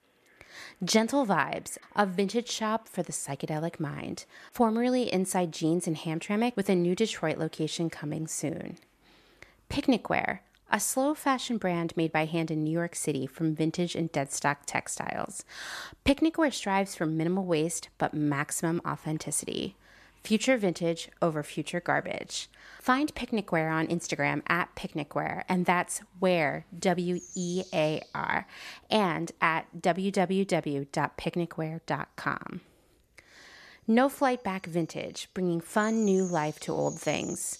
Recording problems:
animal sounds; faint; throughout; 20 dB below the speech

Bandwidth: 14 kHz